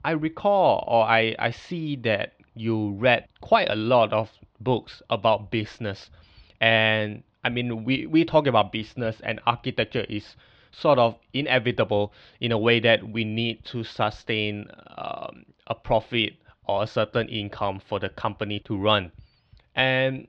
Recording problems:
muffled; slightly; fading above 4 kHz

